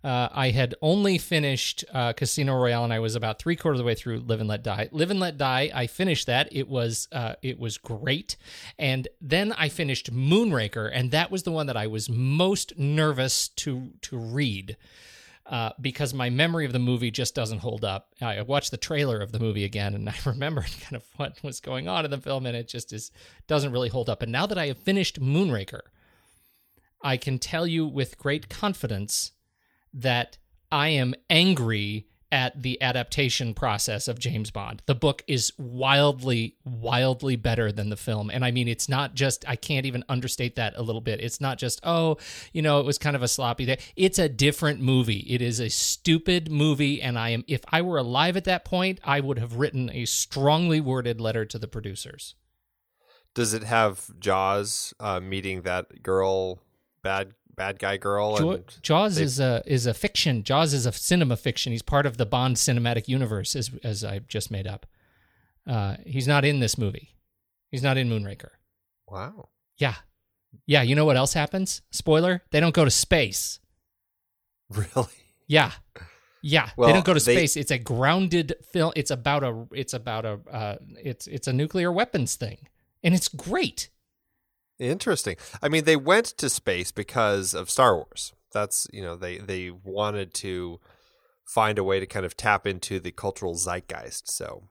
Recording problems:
none

